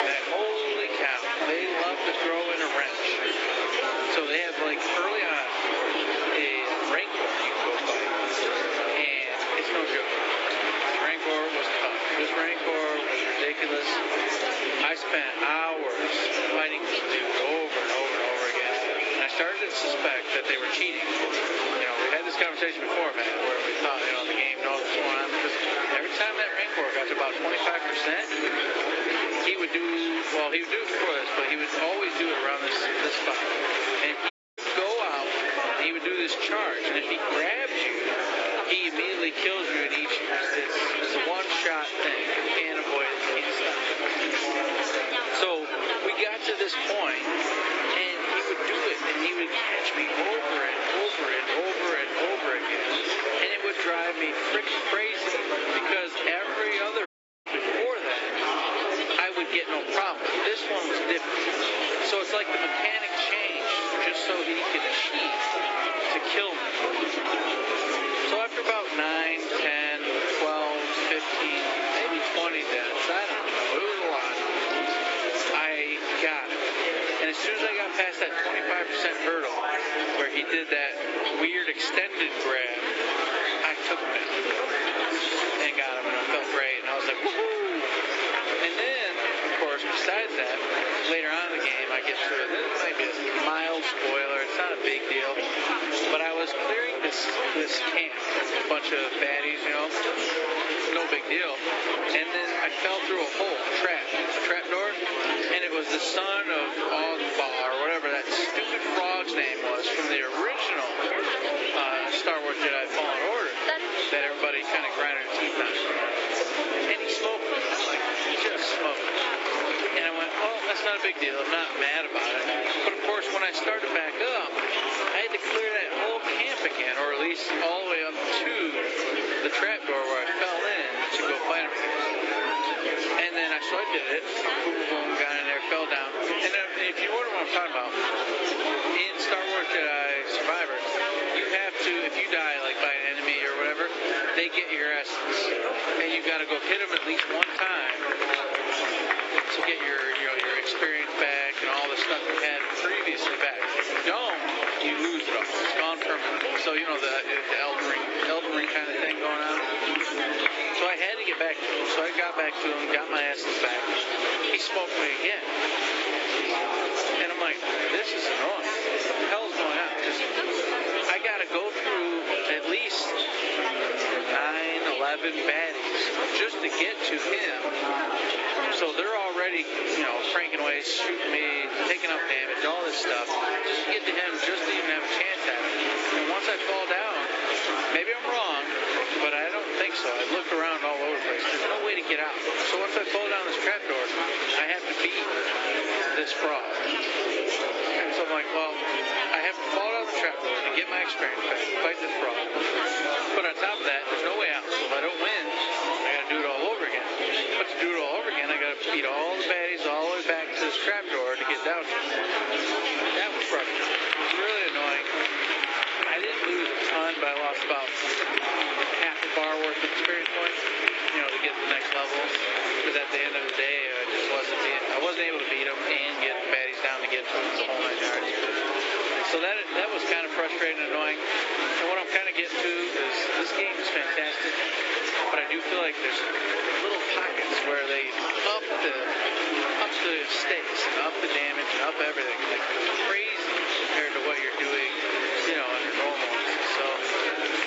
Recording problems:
garbled, watery; badly; nothing above 8 kHz
thin; somewhat; fading below 300 Hz
squashed, flat; somewhat
chatter from many people; very loud; throughout; as loud as the speech
audio cutting out; at 34 s and at 57 s

